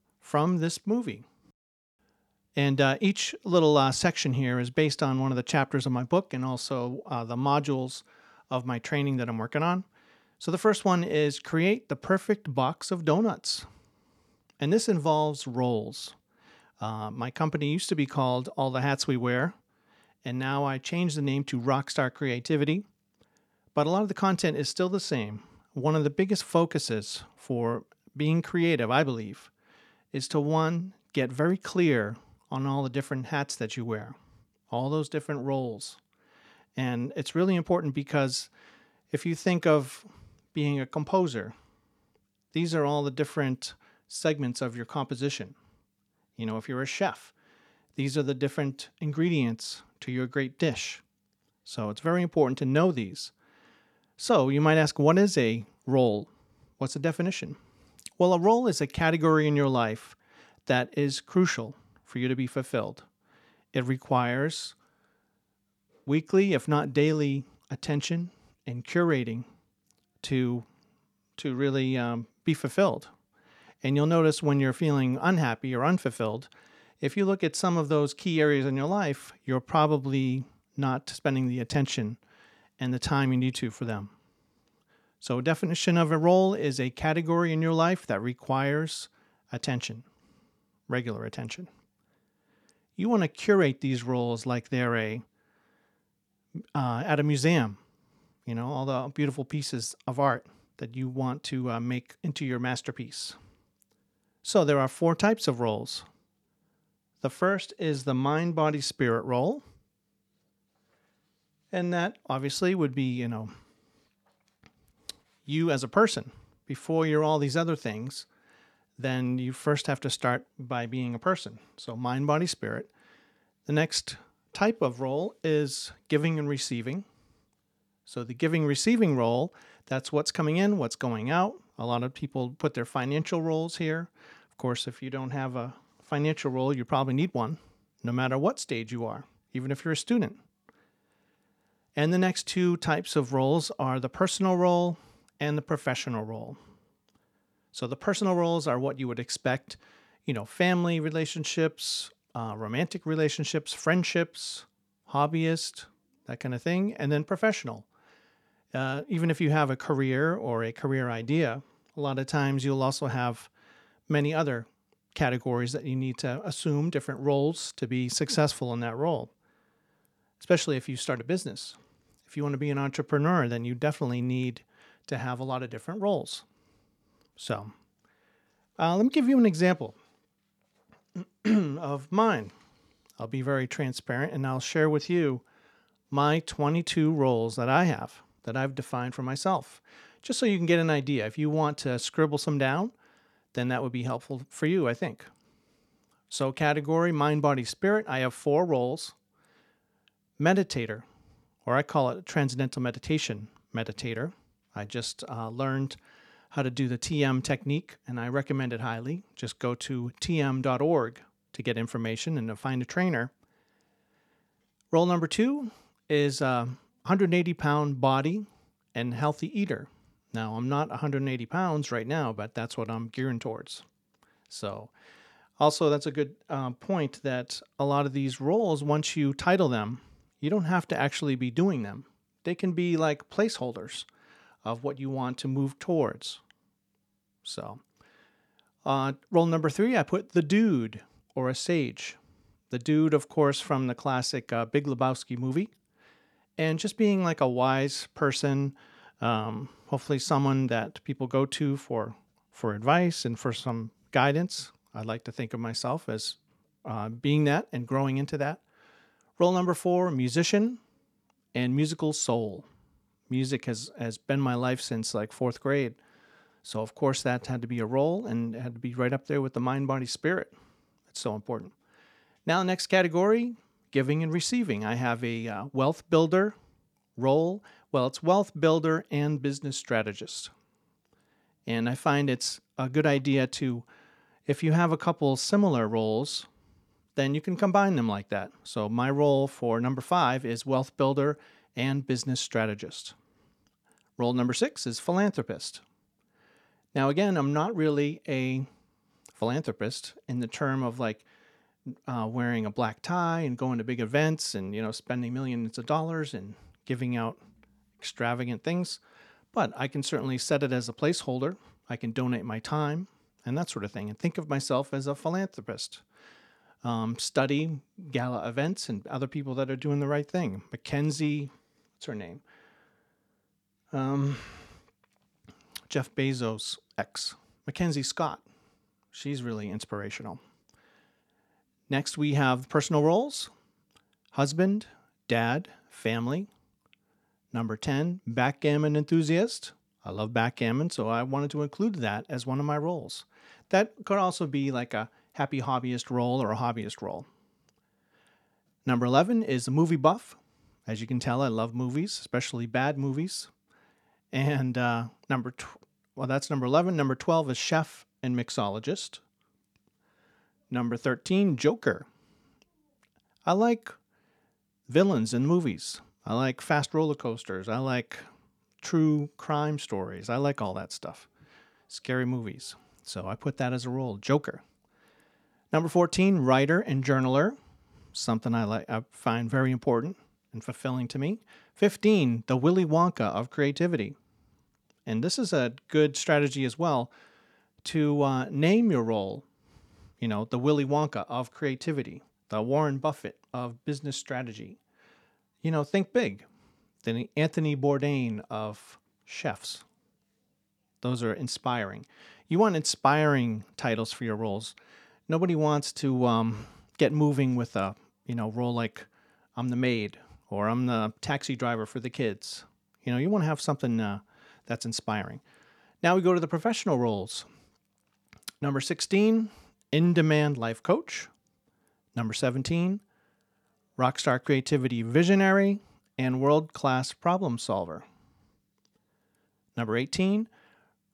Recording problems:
none

